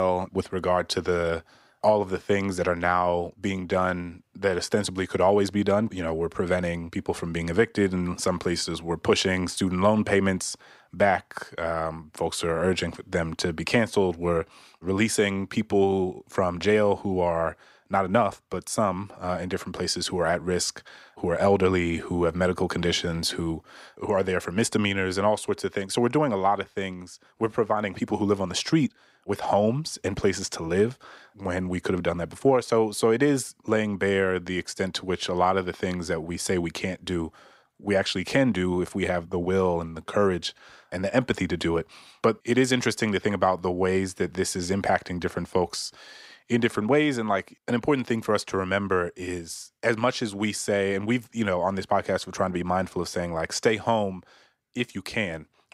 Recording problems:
abrupt cut into speech; at the start

